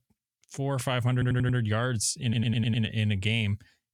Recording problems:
audio stuttering; at 1 s and at 2 s

